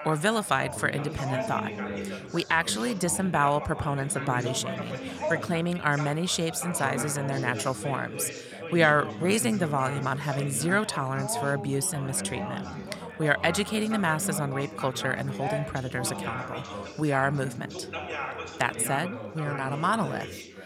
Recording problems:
background chatter; loud; throughout; 4 voices, 8 dB below the speech

